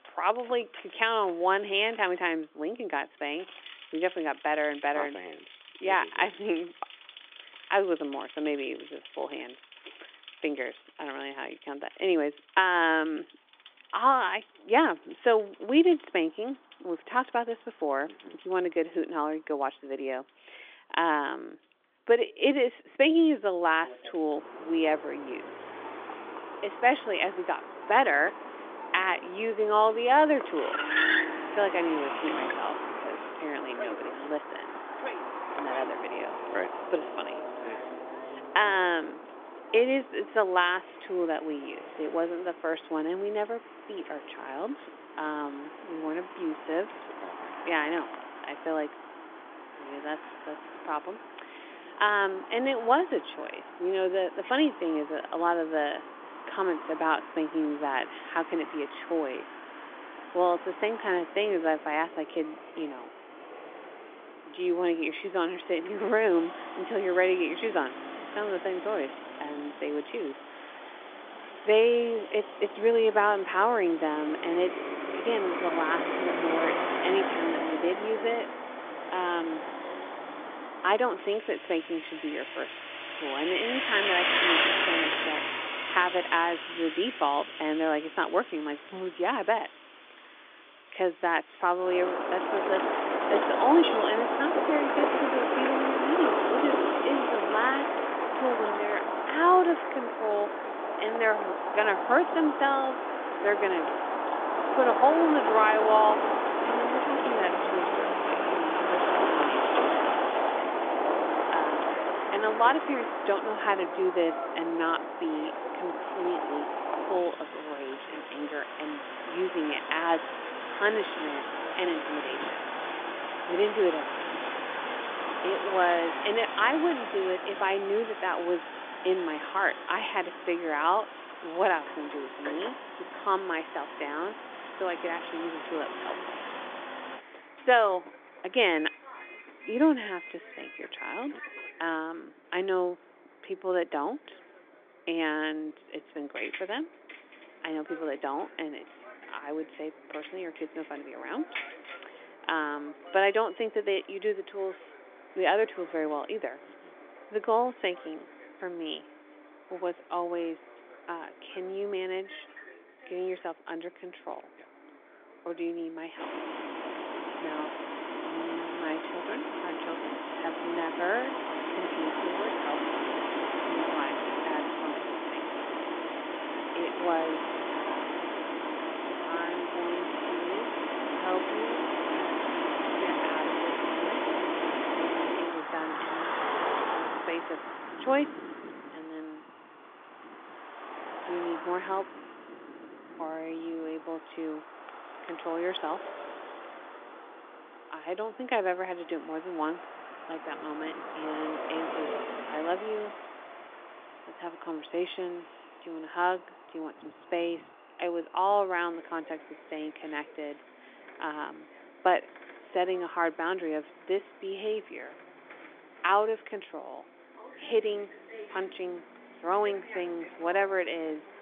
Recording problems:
phone-call audio; nothing above 3.5 kHz
traffic noise; loud; throughout; 3 dB below the speech

